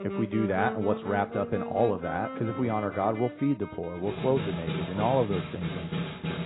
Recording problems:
garbled, watery; badly; nothing above 4 kHz
background music; loud; throughout; 7 dB below the speech

